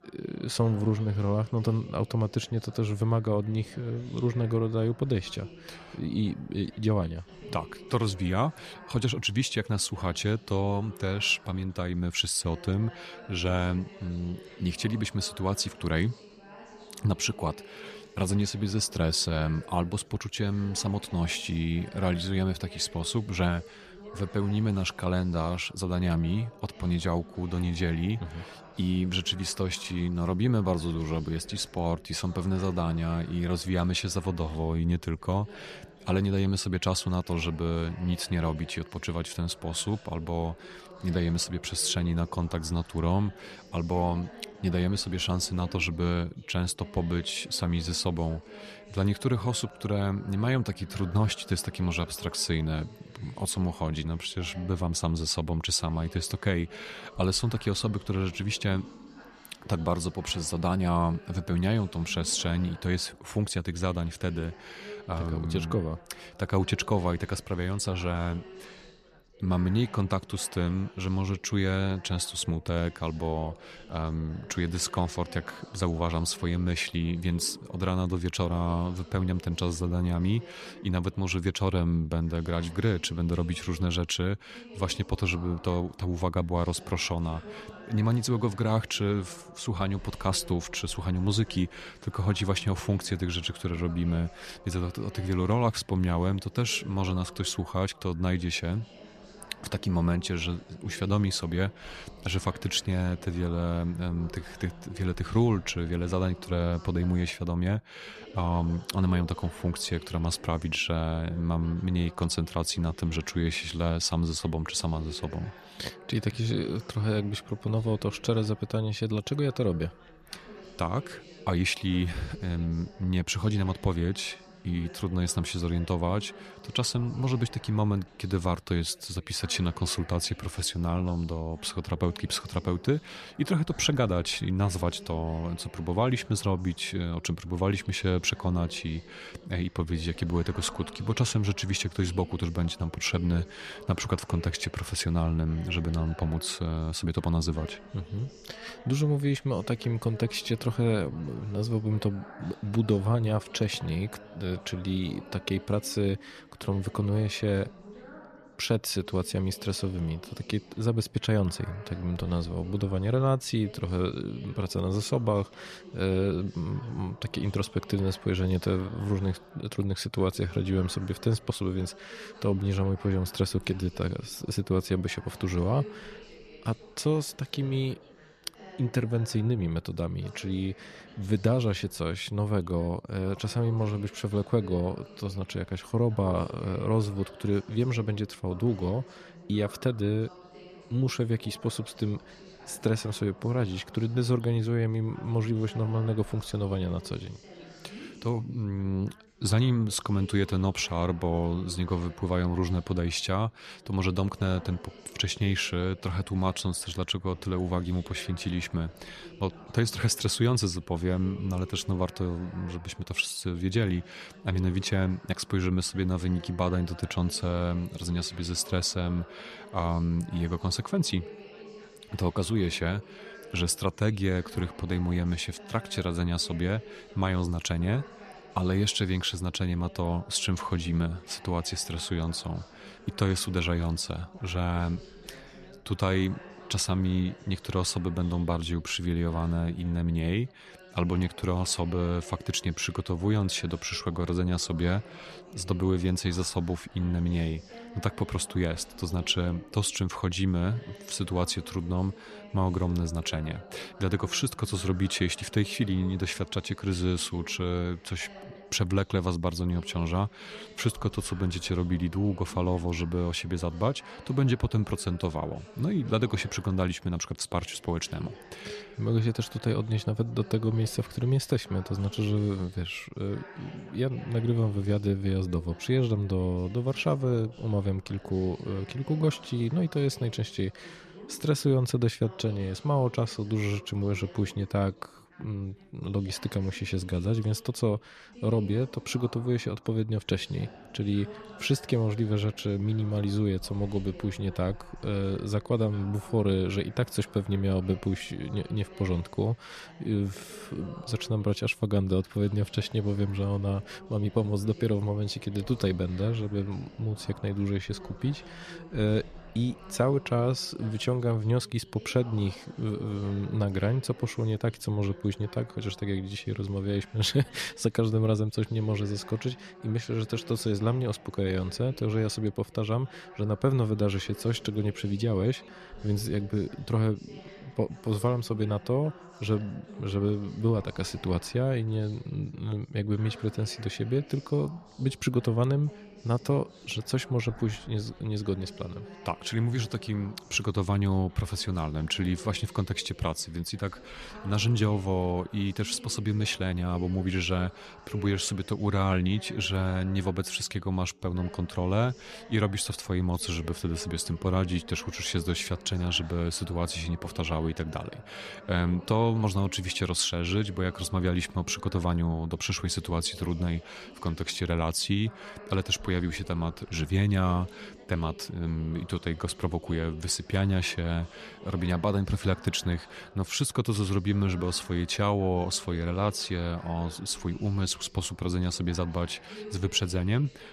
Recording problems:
background chatter; noticeable; throughout; 3 voices, 20 dB below the speech

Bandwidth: 14 kHz